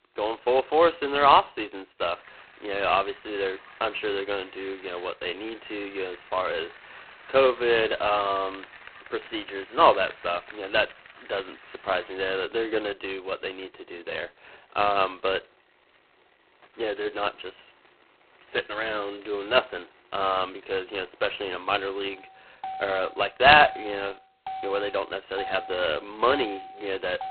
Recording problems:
phone-call audio; poor line; nothing above 4 kHz
traffic noise; noticeable; throughout; 15 dB below the speech

